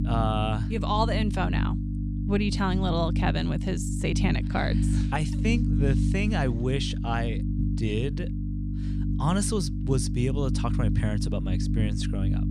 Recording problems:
electrical hum; loud; throughout; 50 Hz, 7 dB below the speech

